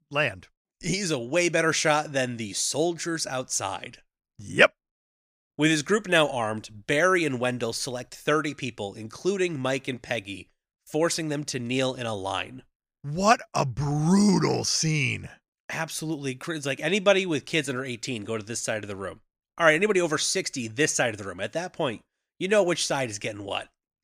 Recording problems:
none

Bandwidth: 15 kHz